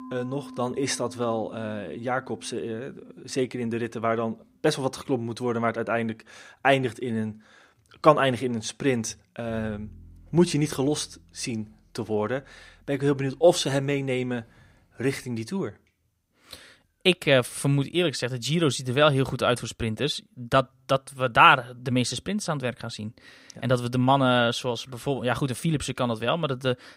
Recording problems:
background music; faint; throughout; 25 dB below the speech

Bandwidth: 15.5 kHz